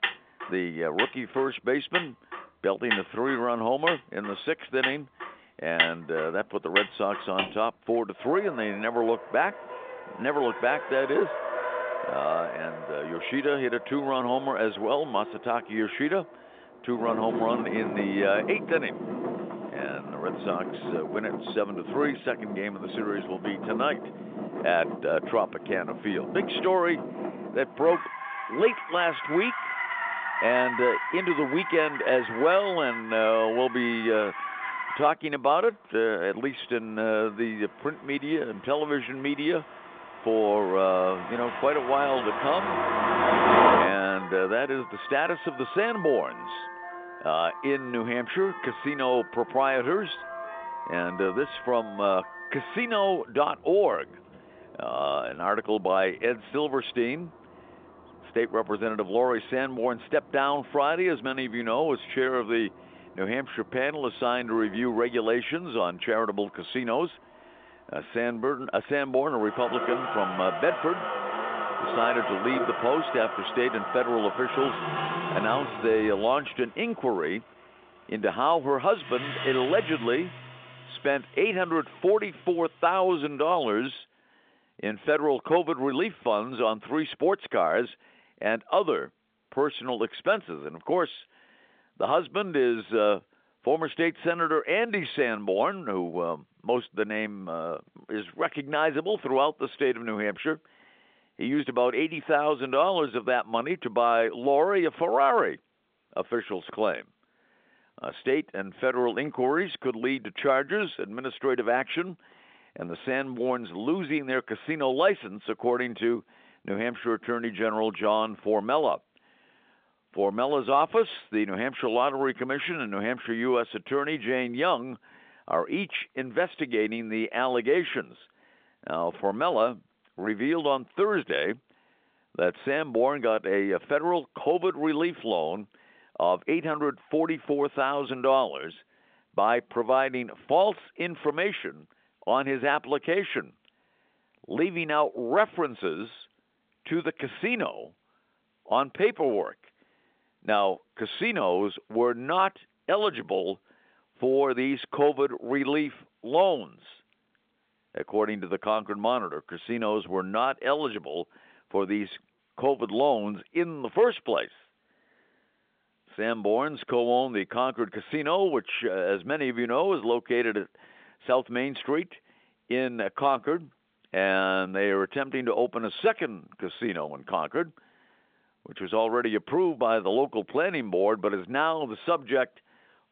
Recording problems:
phone-call audio
traffic noise; loud; until 1:24; 5 dB below the speech

